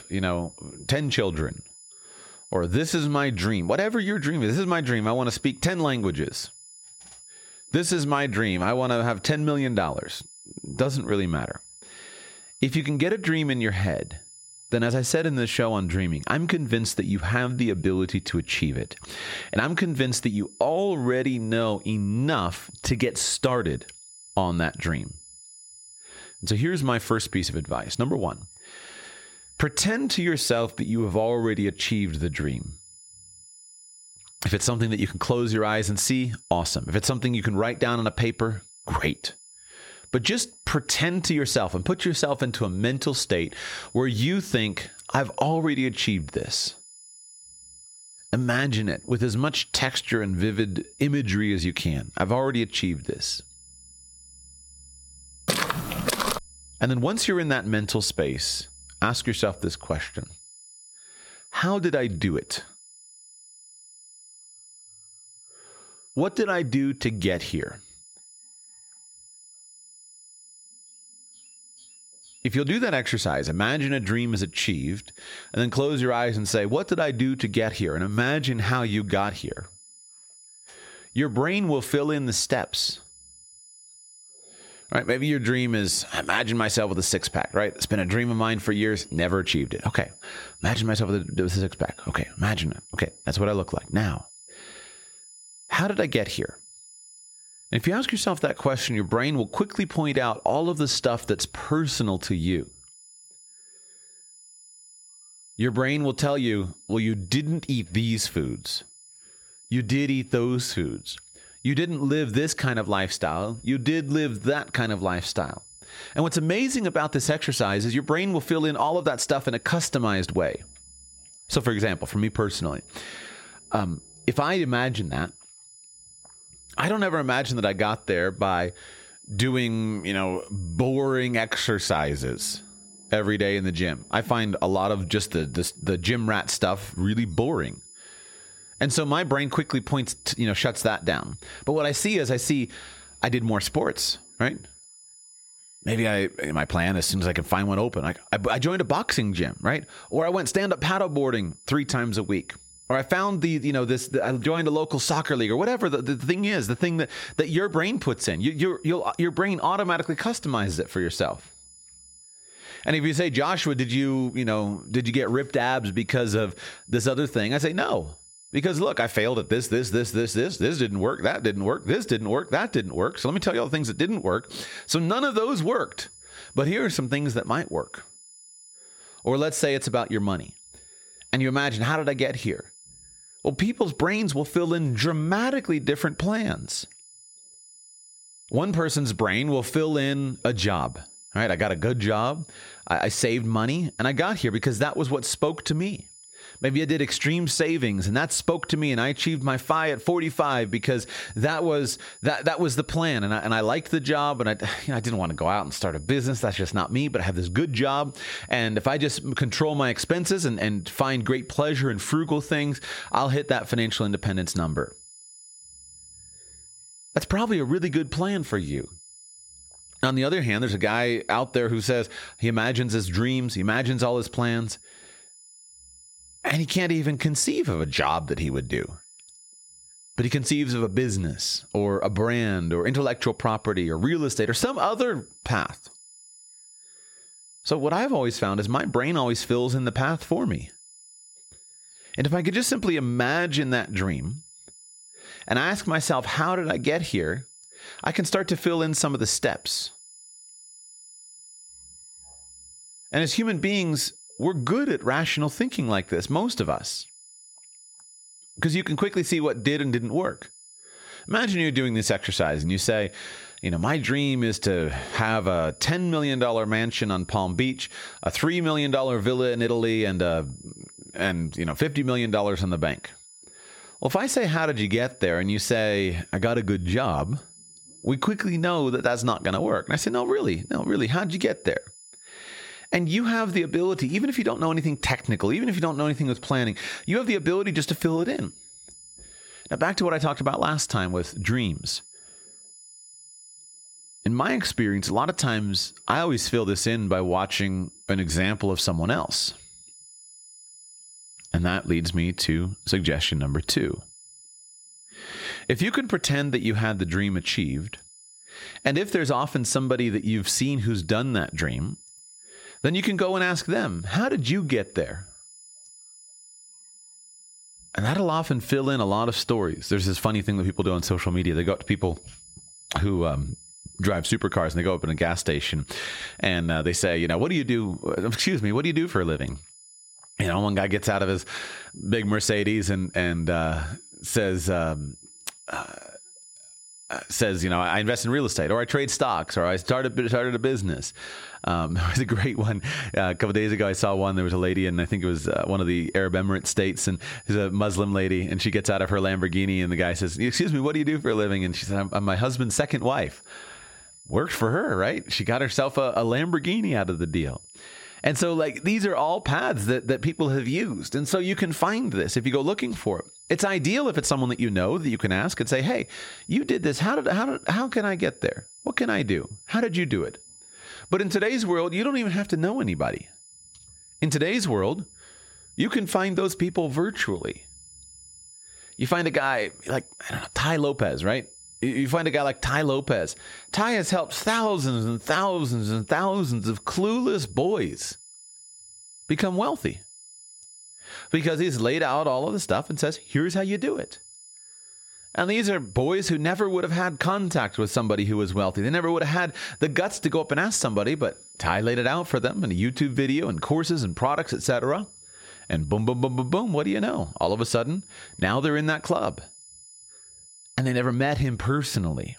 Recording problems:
squashed, flat; somewhat
high-pitched whine; faint; throughout; 10.5 kHz, 25 dB below the speech
footsteps; loud; at 55 s; peak level with the speech

